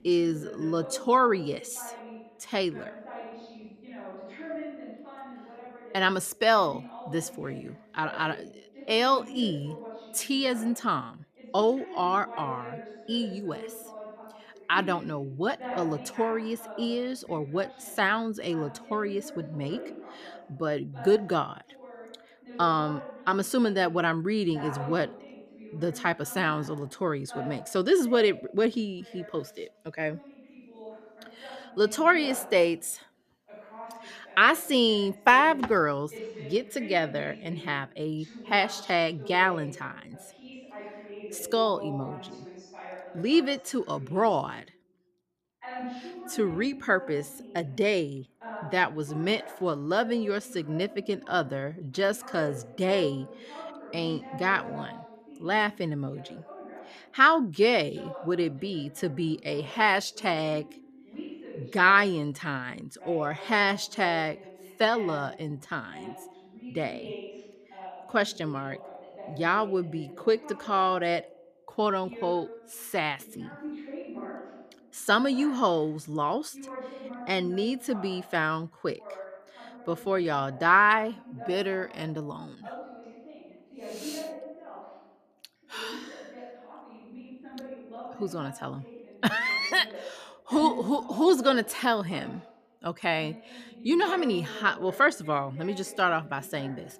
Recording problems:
voice in the background; noticeable; throughout; 15 dB below the speech

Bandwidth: 14.5 kHz